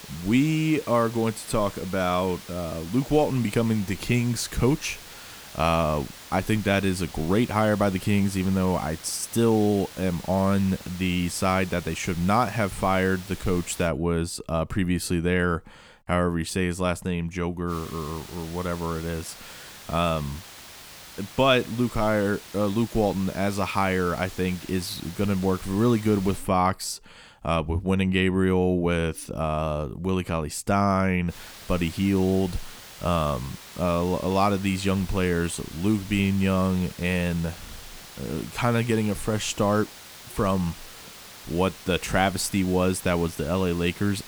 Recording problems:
hiss; noticeable; until 14 s, from 18 to 26 s and from 31 s on; 15 dB below the speech

